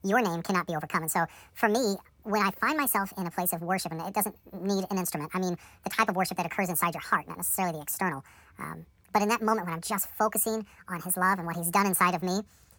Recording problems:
wrong speed and pitch; too fast and too high; 1.6 times normal speed

